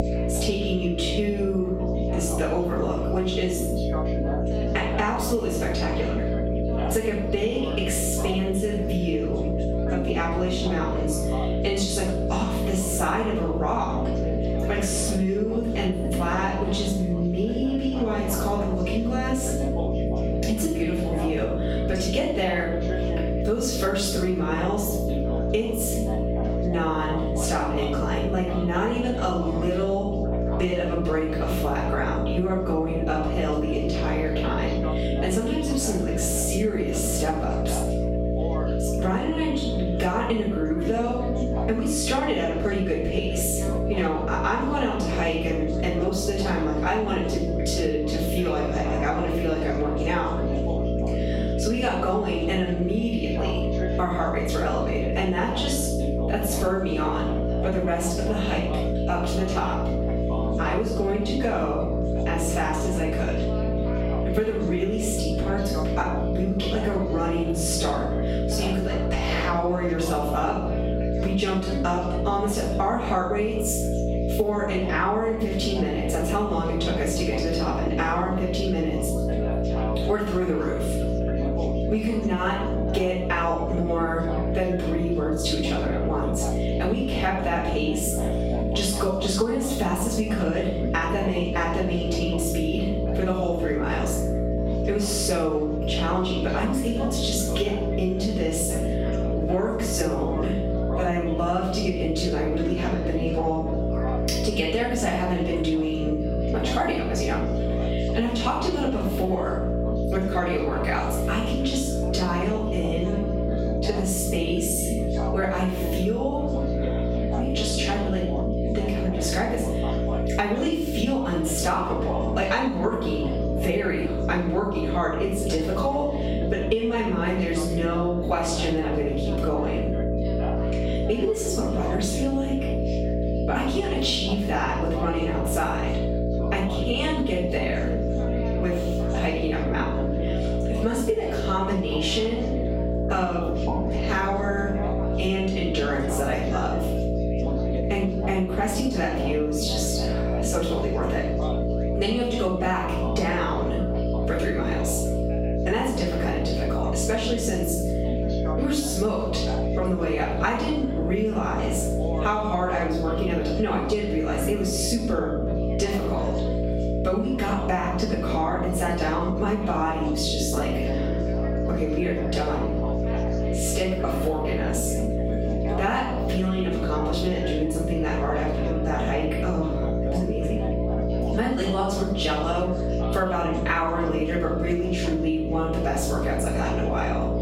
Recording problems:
off-mic speech; far
room echo; noticeable; dies away in 0.5 s
squashed, flat; somewhat
electrical hum; loud; throughout; 60 Hz, 4 dB below the speech
background chatter; noticeable; throughout; 4 voices, 10 dB below the speech

